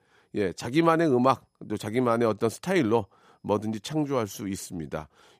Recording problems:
none

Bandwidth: 15 kHz